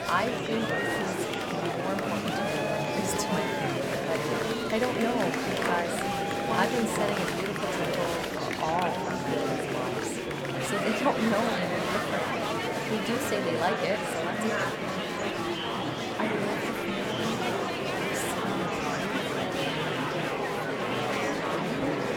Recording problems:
murmuring crowd; very loud; throughout; 5 dB above the speech

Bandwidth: 17.5 kHz